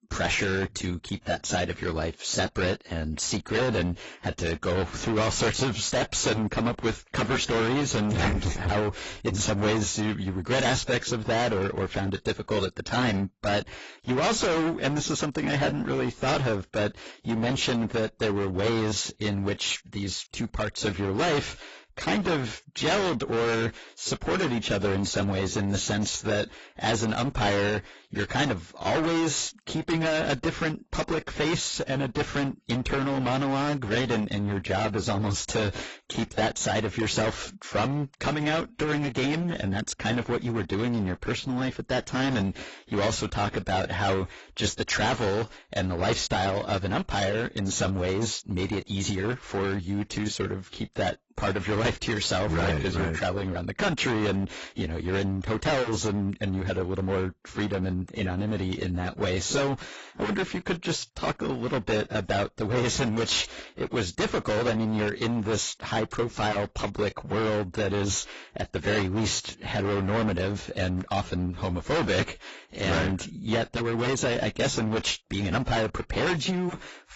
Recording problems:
distortion; heavy; 19% of the sound clipped
garbled, watery; badly; nothing above 7.5 kHz

